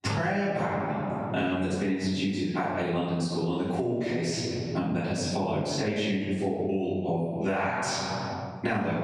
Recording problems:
room echo; strong; dies away in 1.3 s
off-mic speech; far
squashed, flat; somewhat

